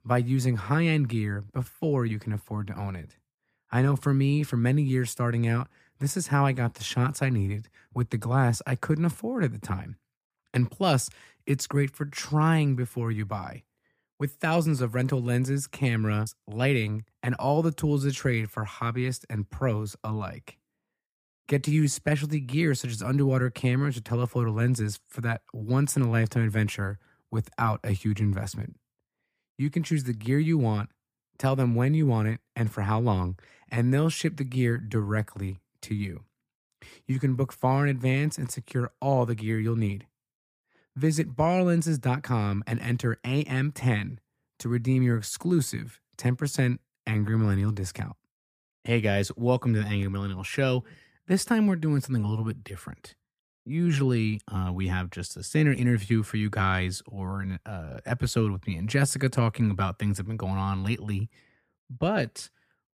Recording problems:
none

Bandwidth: 15 kHz